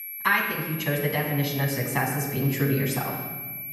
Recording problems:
off-mic speech; far
room echo; noticeable; dies away in 1.3 s
high-pitched whine; loud; throughout; 11.5 kHz, 8 dB below the speech

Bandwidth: 14 kHz